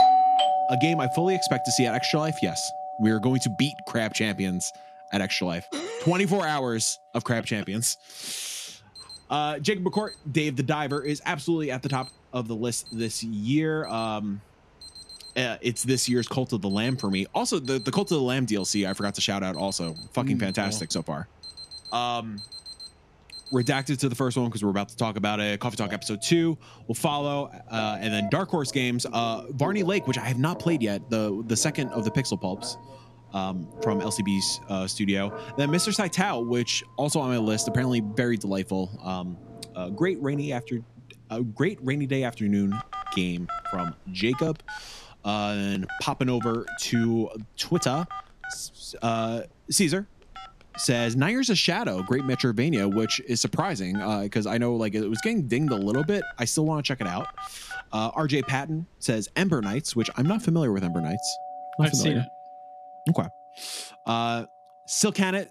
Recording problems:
alarms or sirens; loud; throughout; 9 dB below the speech

